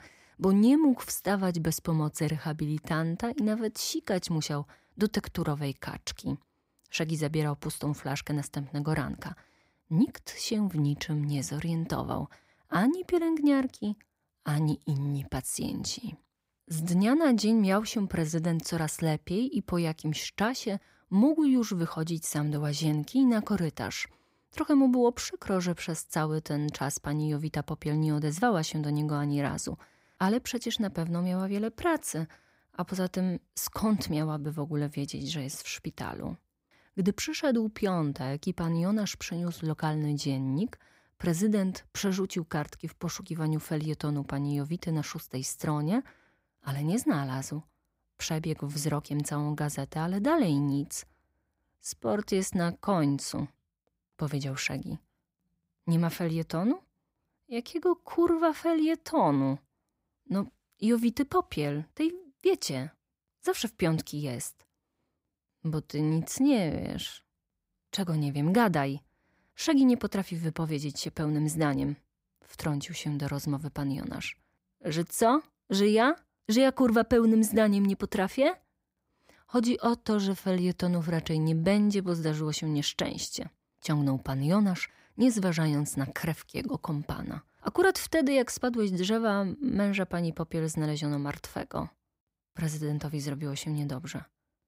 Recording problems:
none

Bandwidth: 15.5 kHz